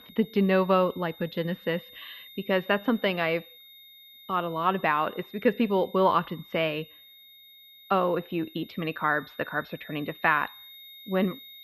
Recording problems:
muffled; very; fading above 3.5 kHz
high-pitched whine; faint; throughout; 3.5 kHz, 20 dB below the speech

